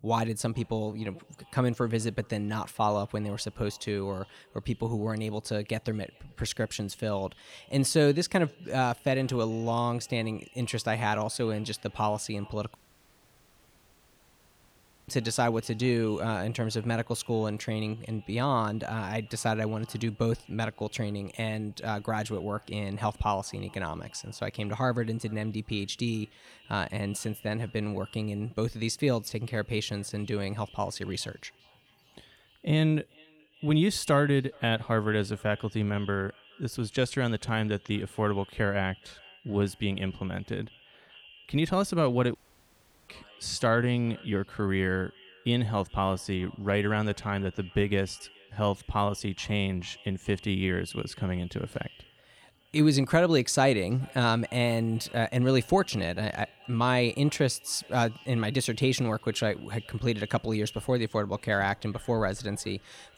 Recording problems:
echo of what is said; faint; throughout; 420 ms later, 25 dB below the speech
audio cutting out; at 13 s for 2.5 s and at 42 s for 0.5 s

